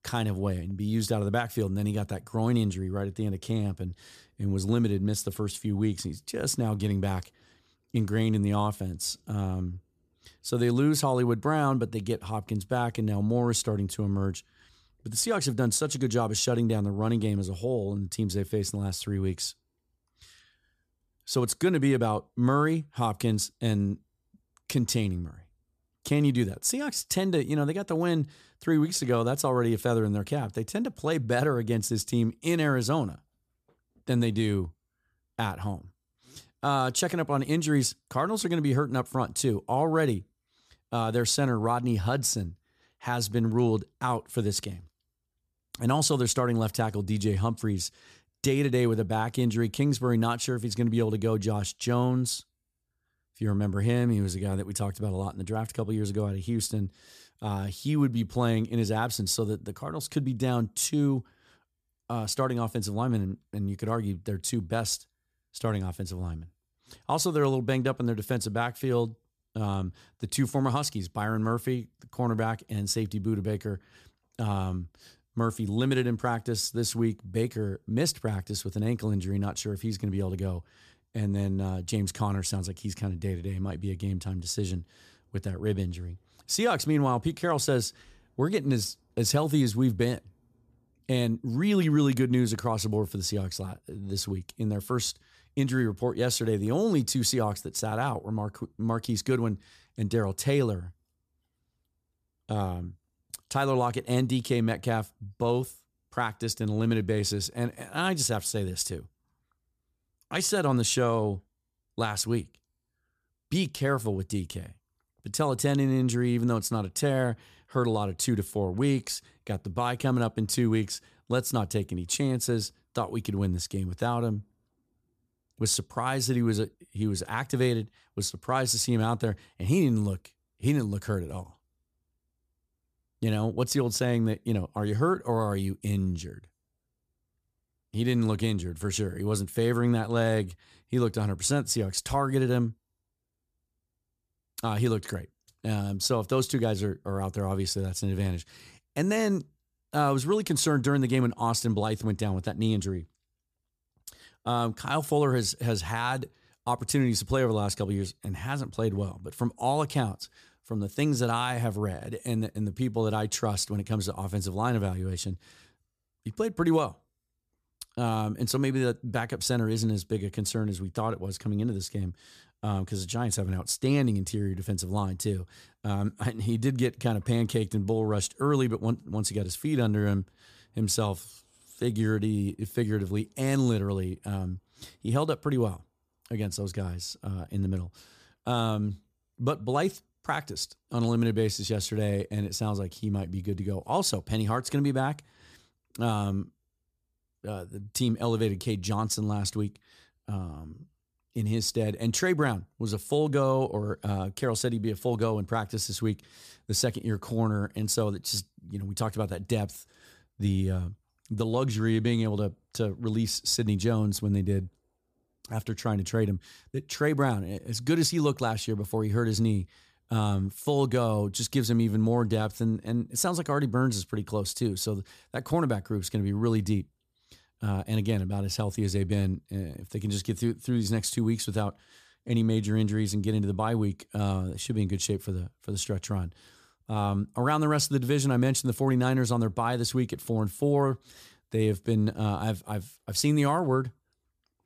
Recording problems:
none

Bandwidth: 14.5 kHz